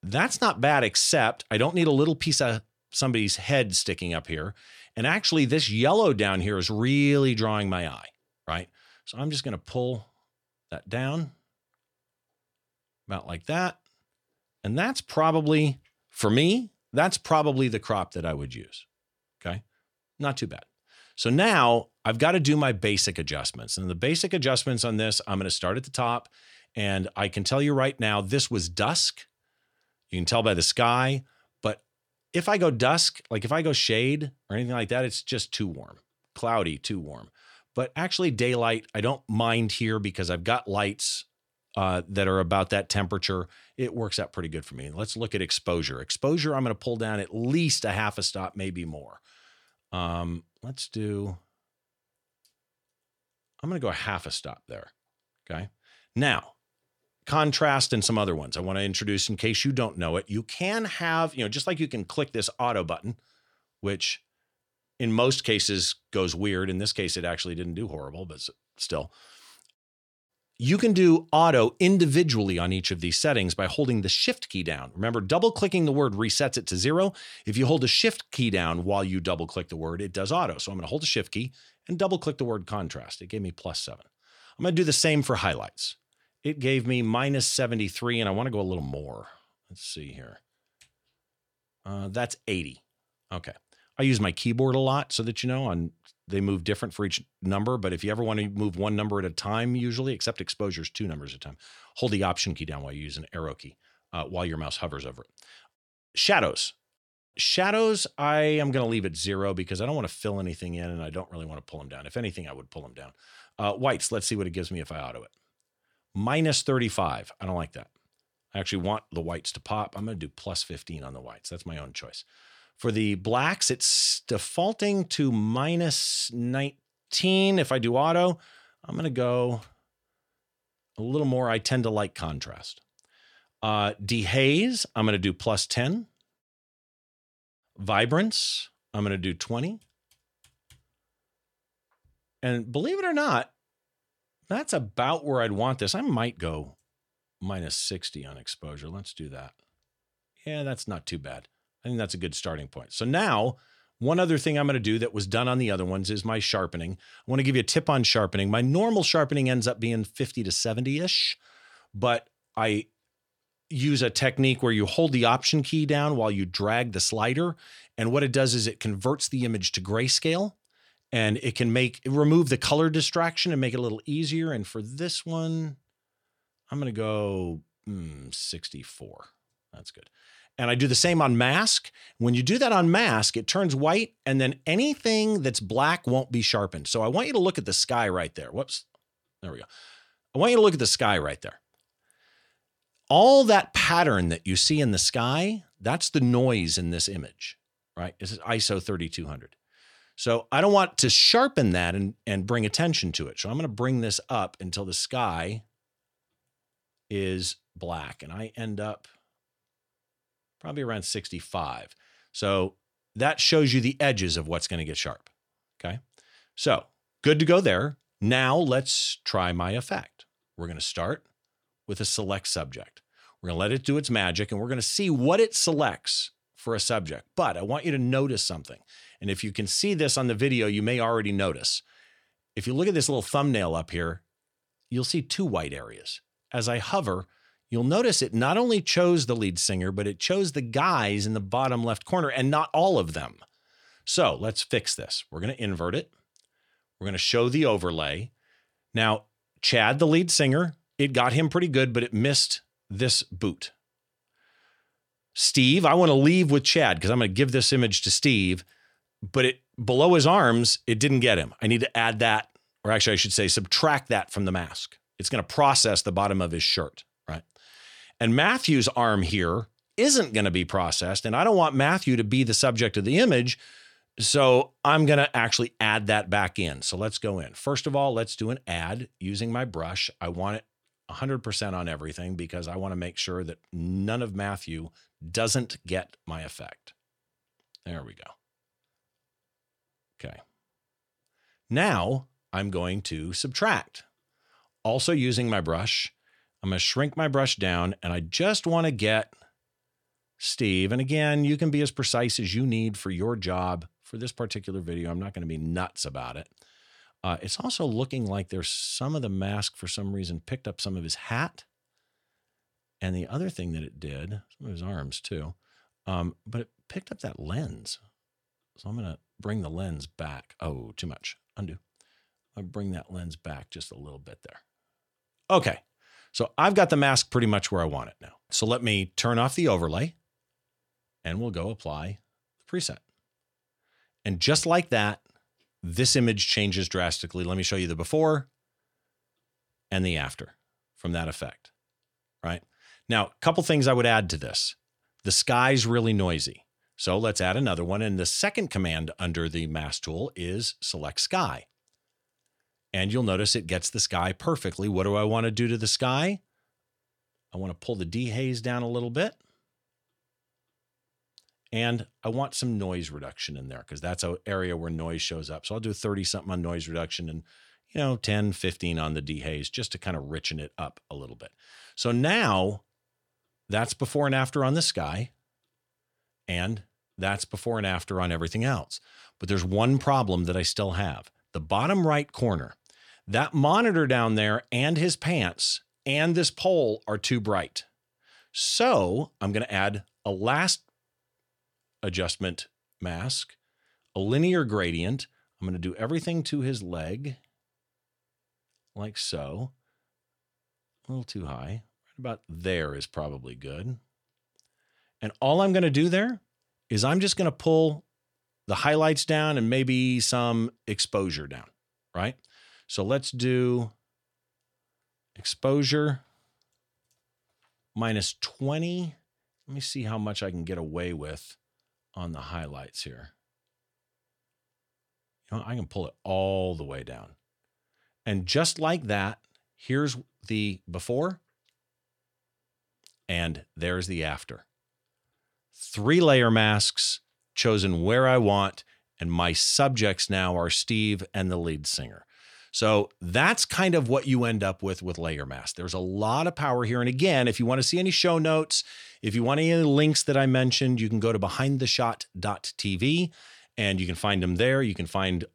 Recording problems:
none

